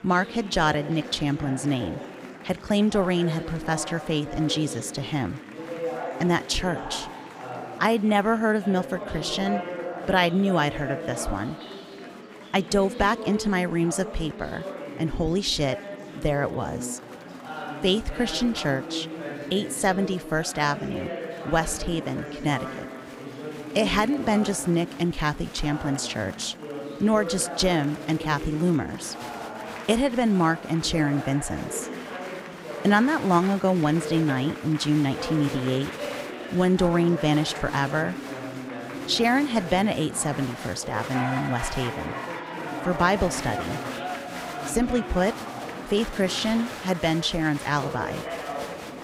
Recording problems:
murmuring crowd; loud; throughout; 10 dB below the speech

